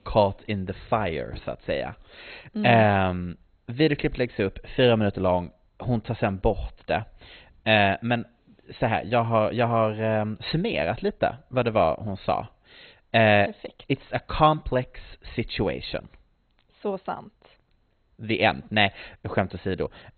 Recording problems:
garbled, watery; badly; nothing above 4 kHz

